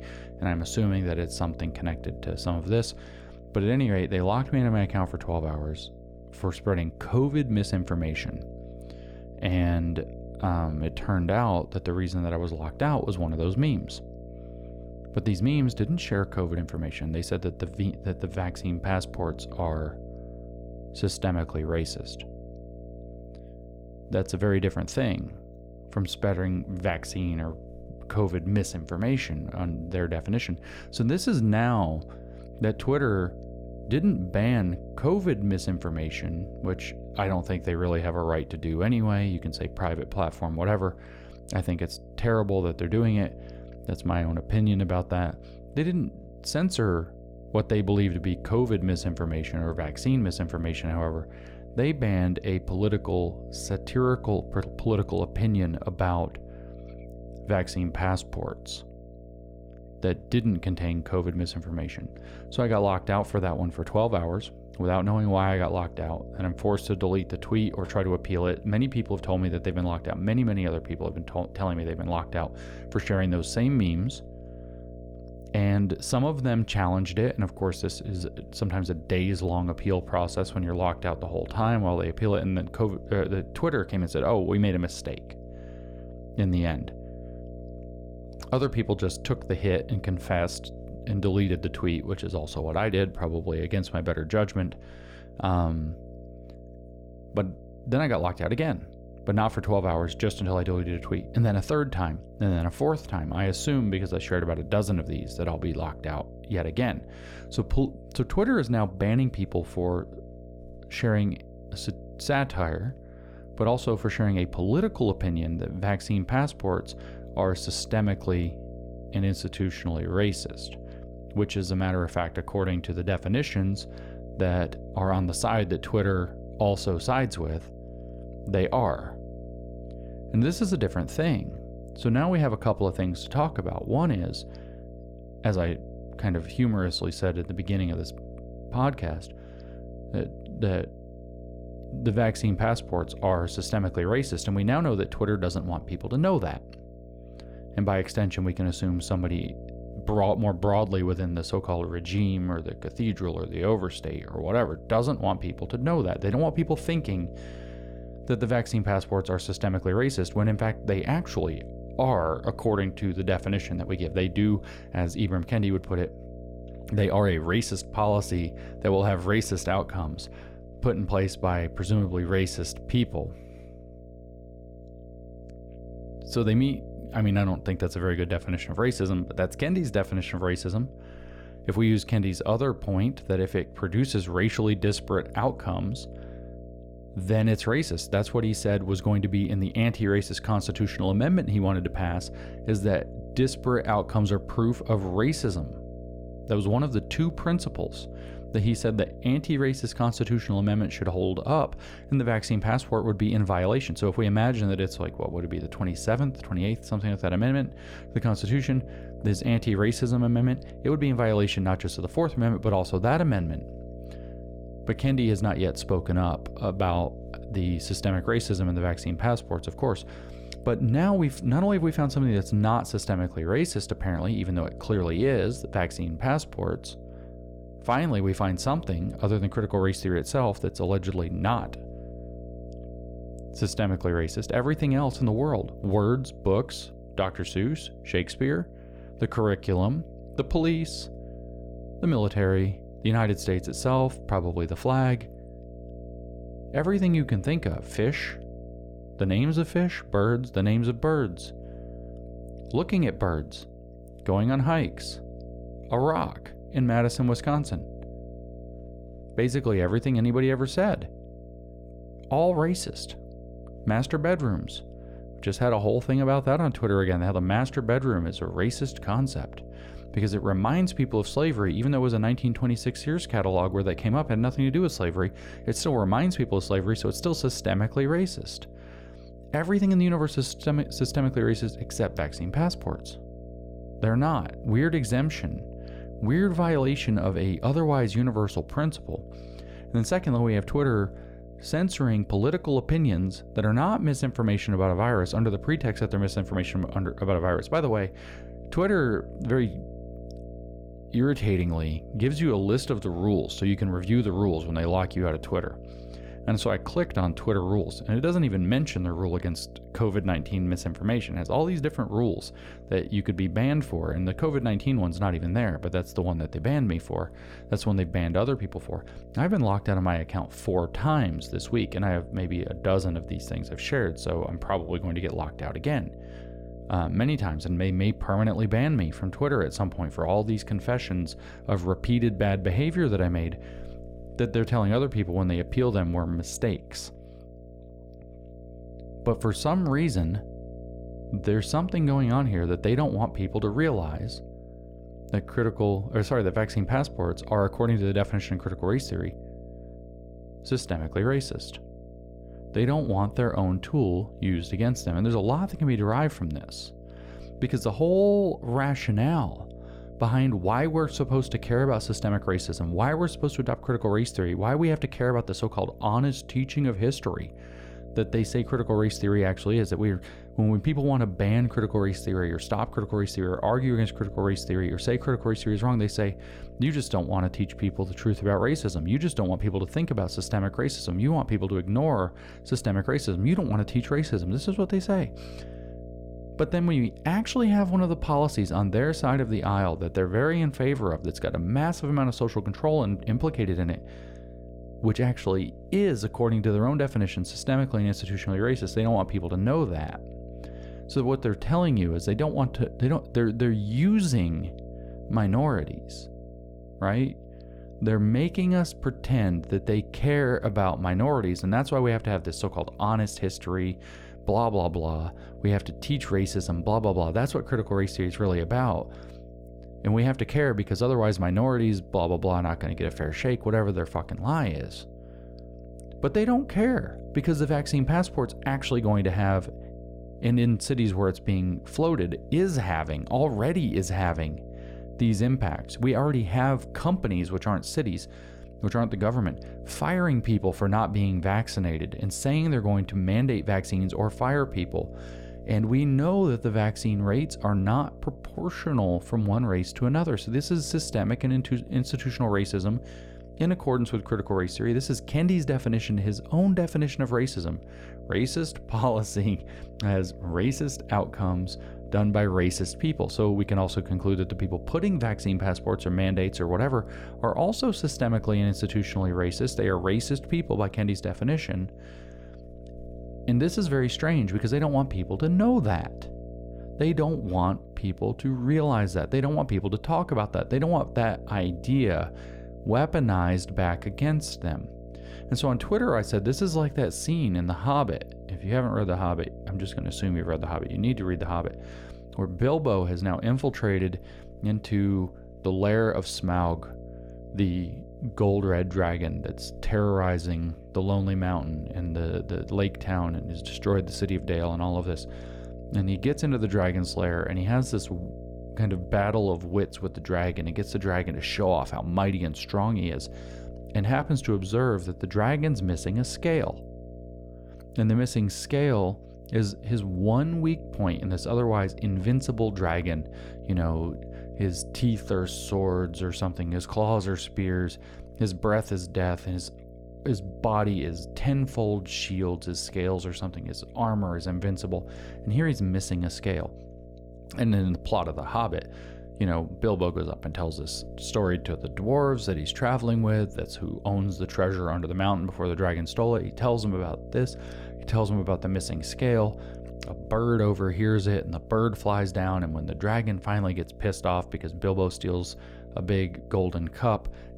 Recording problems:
electrical hum; noticeable; throughout; 60 Hz, 15 dB below the speech

